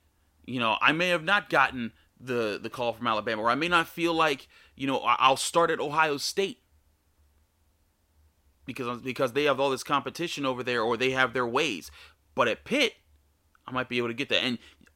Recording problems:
none

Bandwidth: 16 kHz